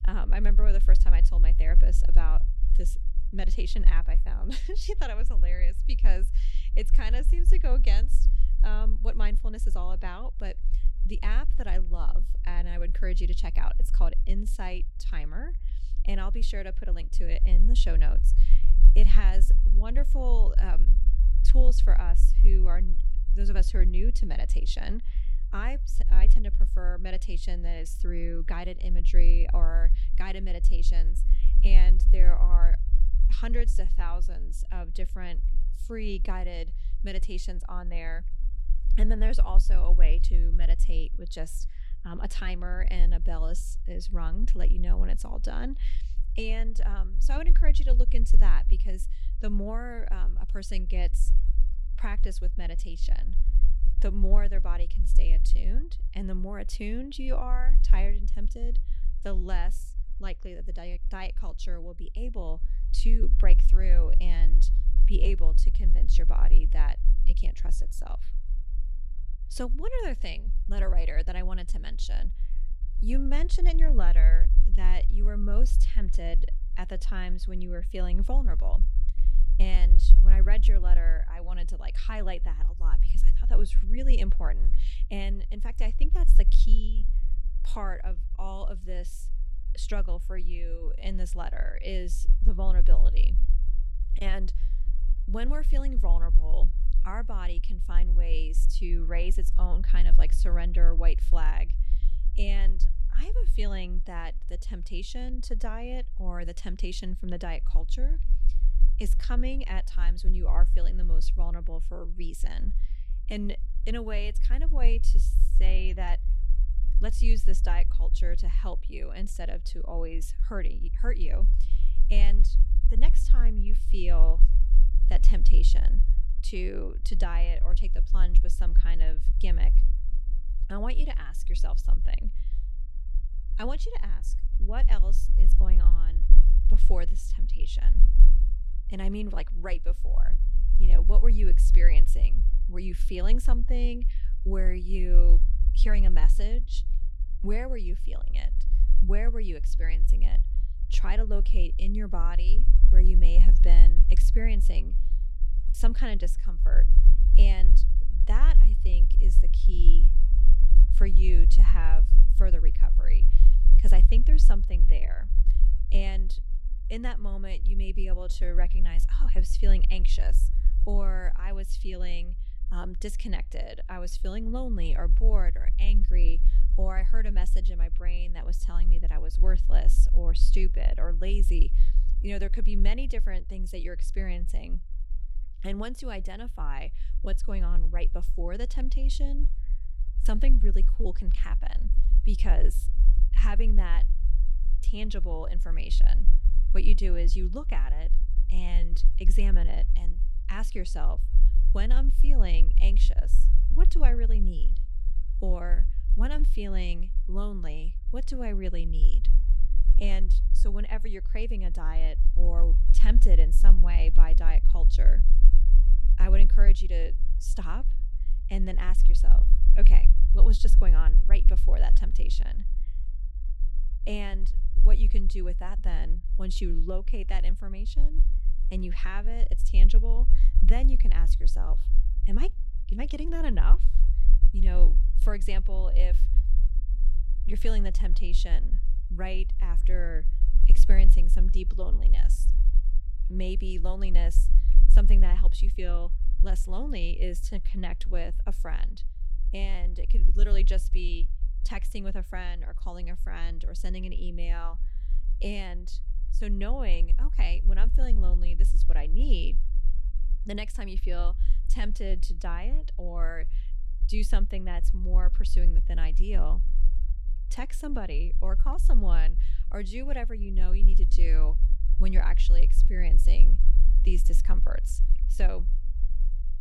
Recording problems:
low rumble; noticeable; throughout; 15 dB below the speech

